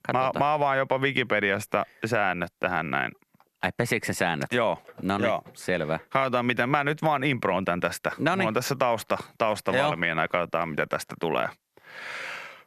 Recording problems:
squashed, flat; heavily

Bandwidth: 14 kHz